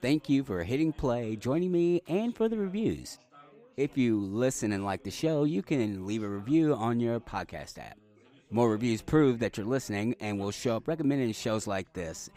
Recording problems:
background chatter; faint; throughout; 4 voices, 30 dB below the speech

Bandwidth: 15.5 kHz